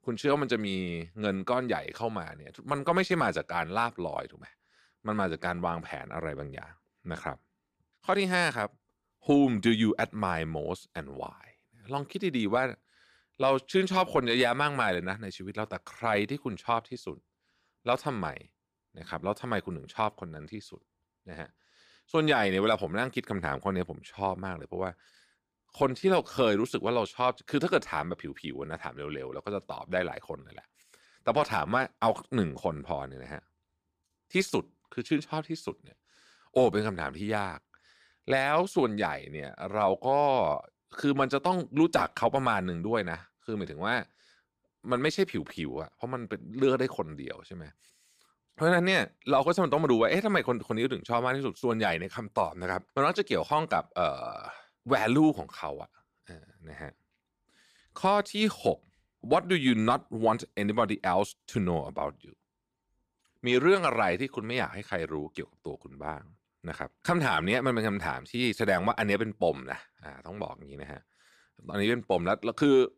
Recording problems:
none

